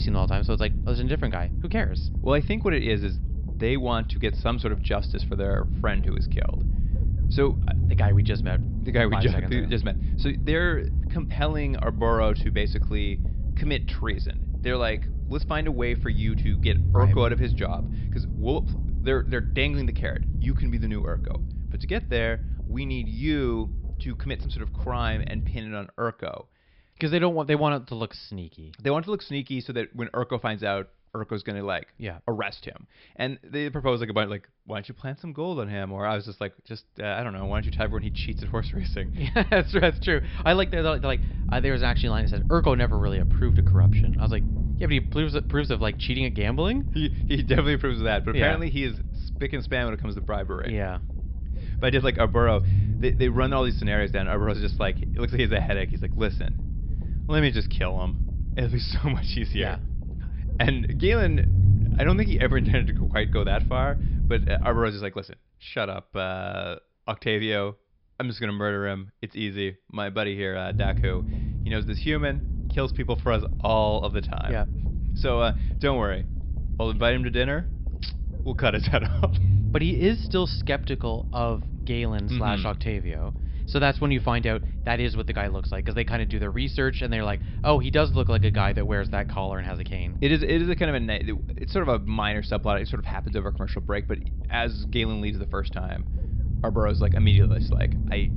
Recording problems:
high frequencies cut off; noticeable; nothing above 5.5 kHz
low rumble; noticeable; until 26 s, from 37 s to 1:05 and from 1:11 on; 15 dB below the speech
abrupt cut into speech; at the start

